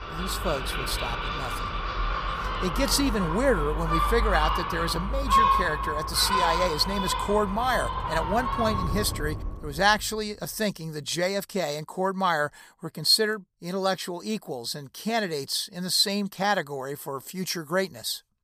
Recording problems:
animal sounds; loud; until 9 s; 1 dB below the speech

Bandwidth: 15 kHz